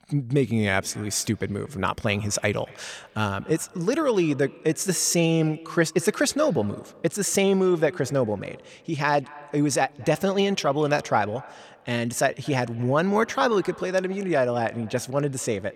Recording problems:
echo of what is said; faint; throughout; 230 ms later, 20 dB below the speech

